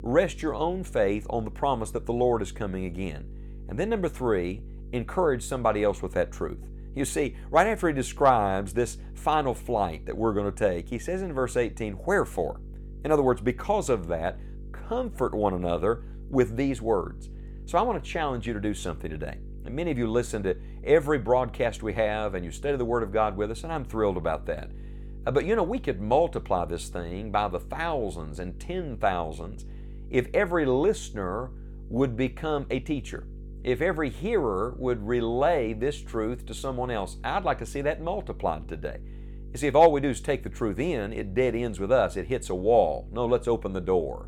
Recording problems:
electrical hum; faint; throughout; 50 Hz, 25 dB below the speech

